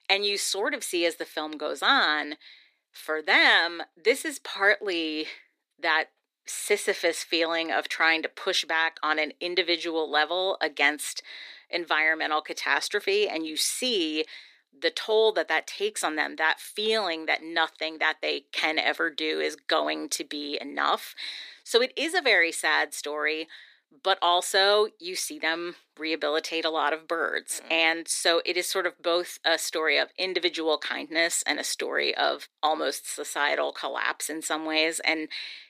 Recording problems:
thin; very; fading below 350 Hz

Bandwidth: 15 kHz